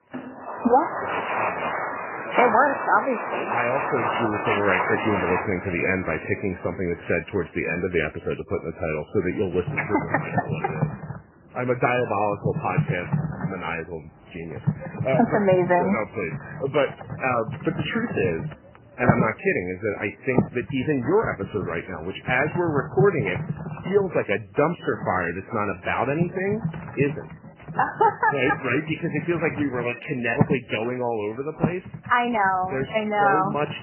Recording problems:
garbled, watery; badly; nothing above 3 kHz
household noises; loud; throughout; 5 dB below the speech

